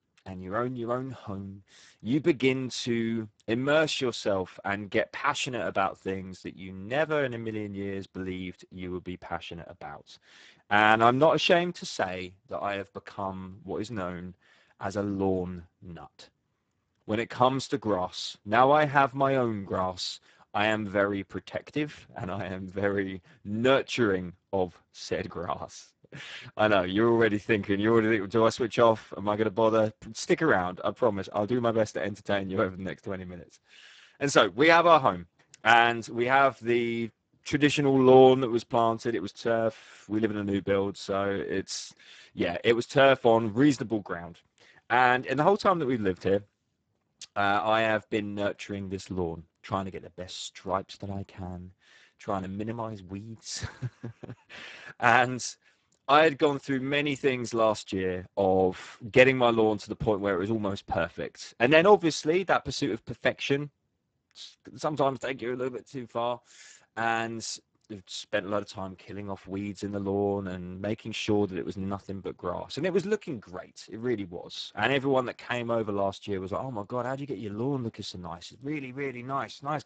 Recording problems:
garbled, watery; badly; nothing above 8 kHz

